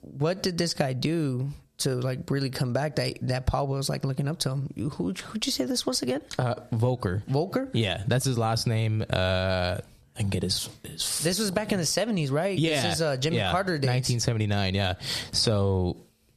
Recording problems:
squashed, flat; heavily

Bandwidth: 14.5 kHz